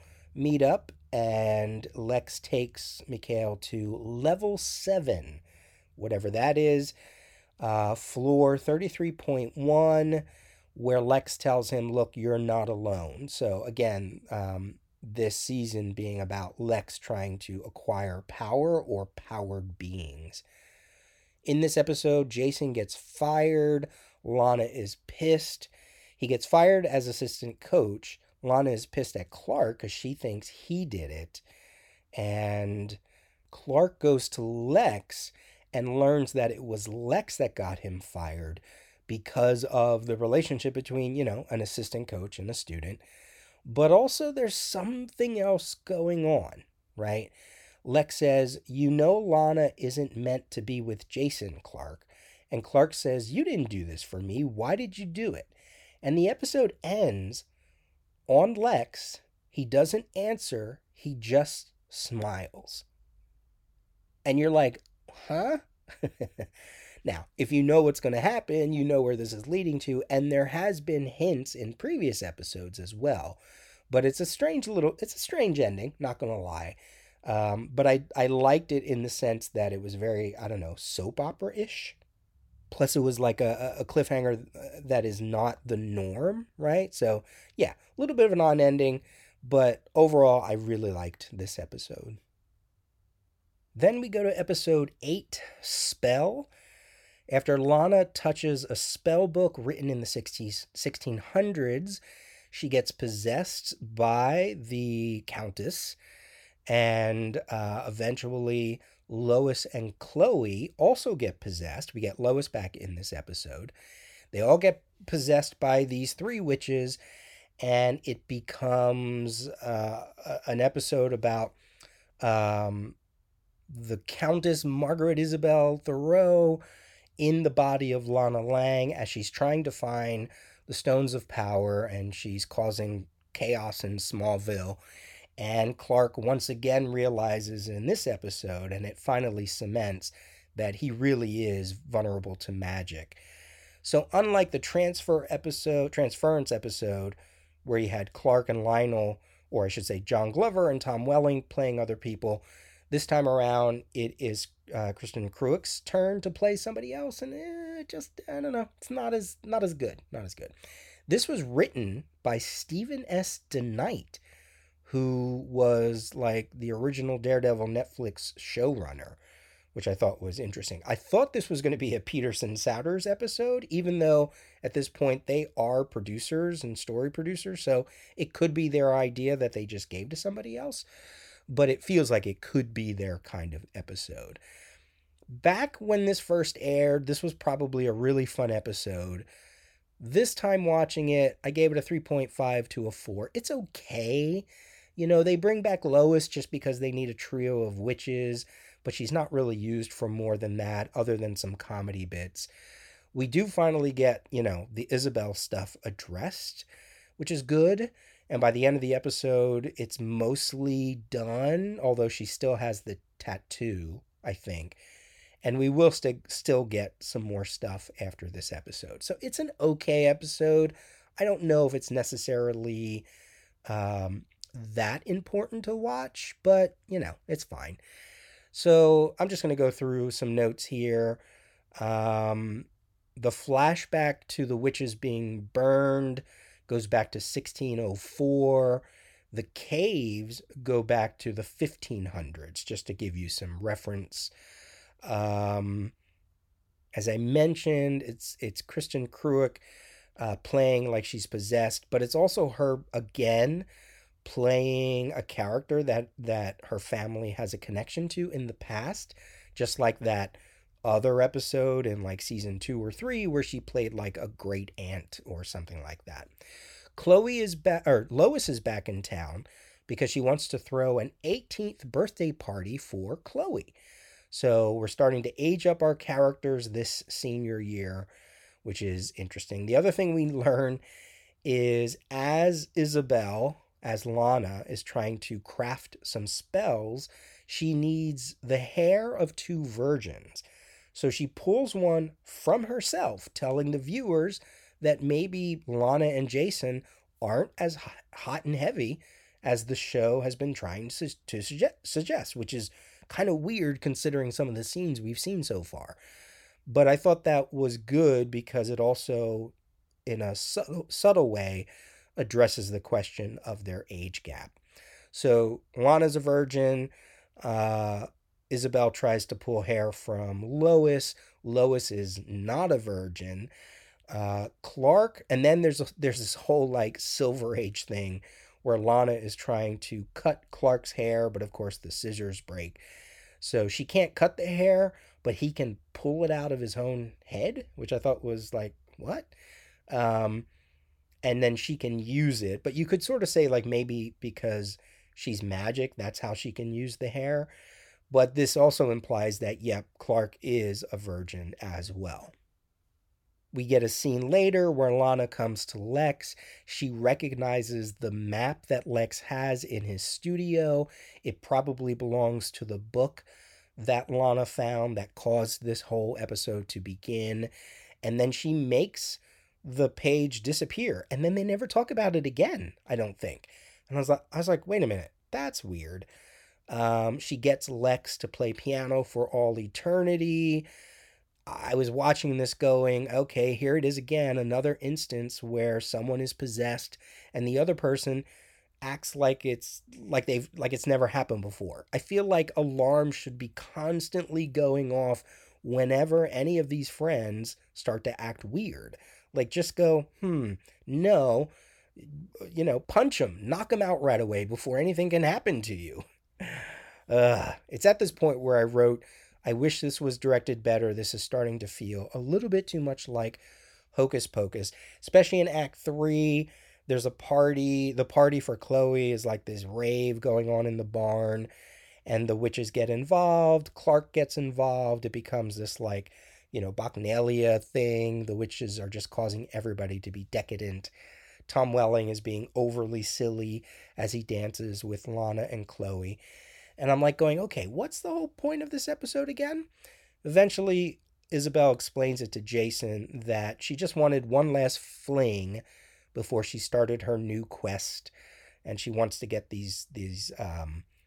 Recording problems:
none

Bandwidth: 18.5 kHz